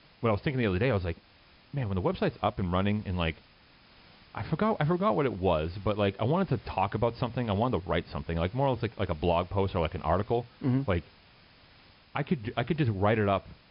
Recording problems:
high frequencies cut off; noticeable; nothing above 5.5 kHz
hiss; faint; throughout; 25 dB below the speech

